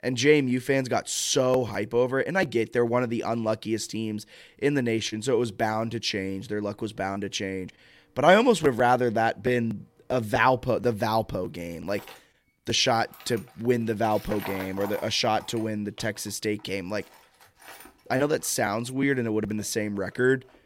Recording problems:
machinery noise; noticeable; throughout; 20 dB below the speech

